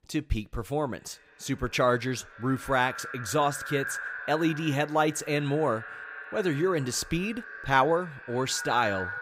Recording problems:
echo of what is said; strong; throughout; 240 ms later, 10 dB below the speech

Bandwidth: 15.5 kHz